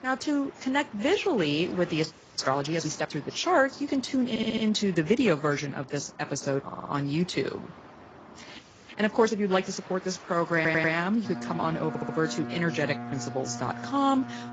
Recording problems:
garbled, watery; badly; nothing above 7.5 kHz
train or aircraft noise; noticeable; throughout; 15 dB below the speech
audio freezing; at 2 s and at 8.5 s
audio stuttering; 4 times, first at 4.5 s

